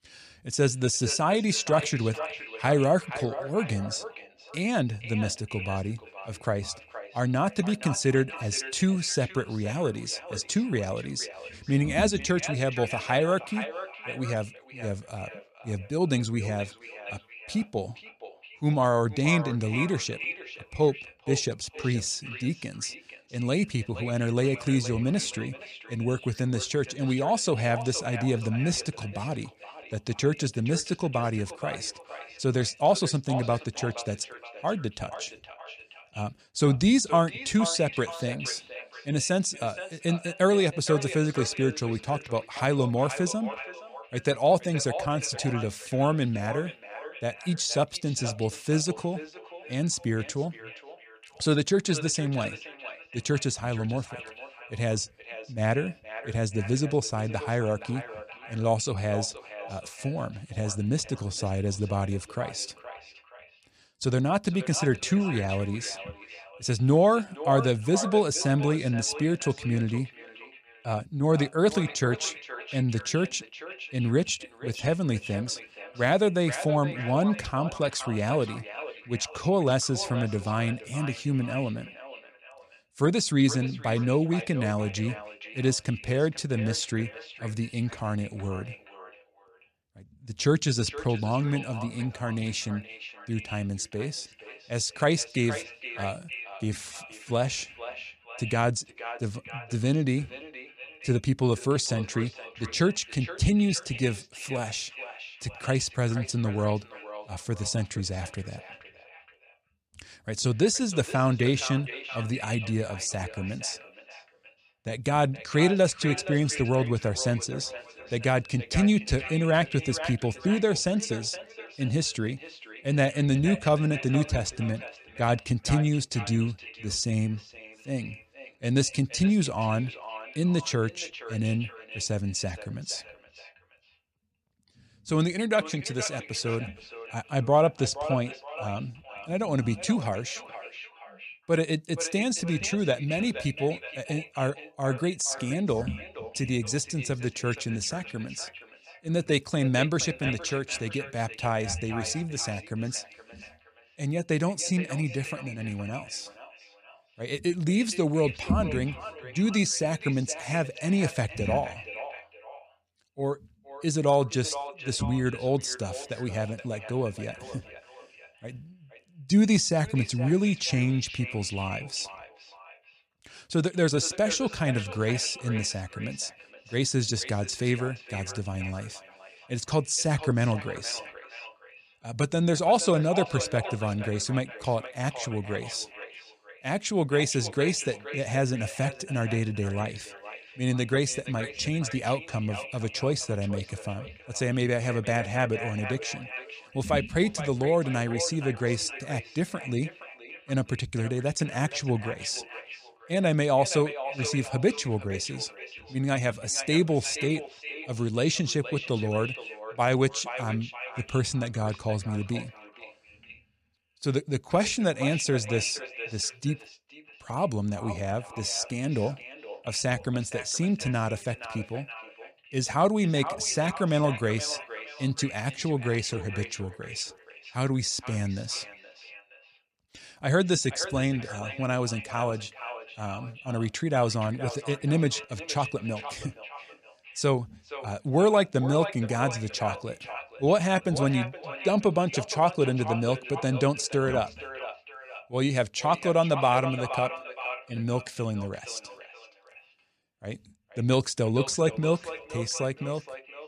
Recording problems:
echo of what is said; noticeable; throughout; 470 ms later, 10 dB below the speech

